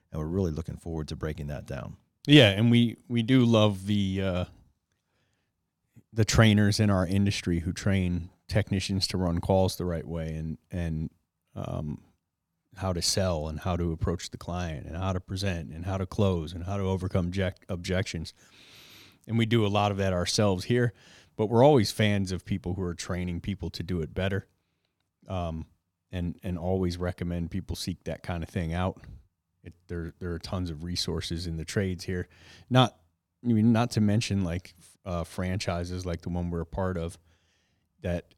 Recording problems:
none

